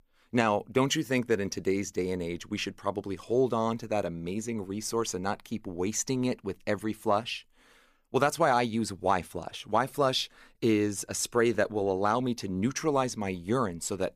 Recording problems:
none

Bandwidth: 15 kHz